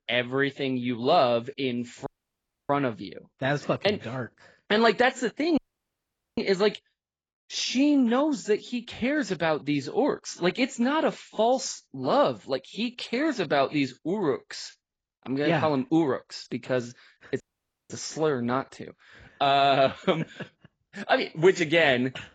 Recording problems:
garbled, watery; badly; nothing above 7.5 kHz
audio cutting out; at 2 s for 0.5 s, at 5.5 s for 1 s and at 17 s for 0.5 s

